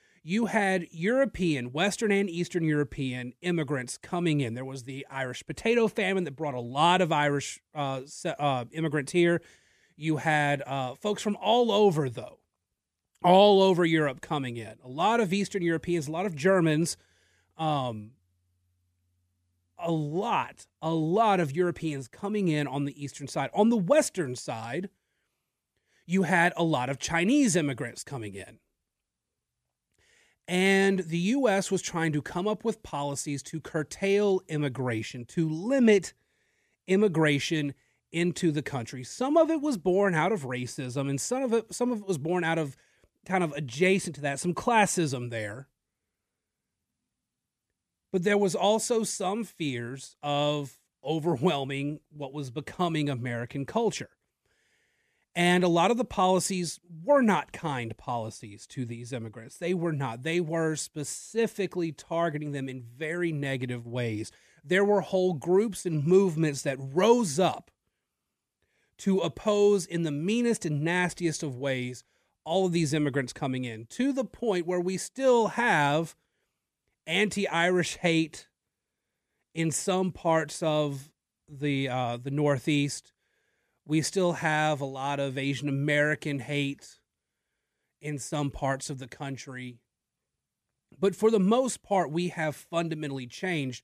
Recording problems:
none

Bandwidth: 14.5 kHz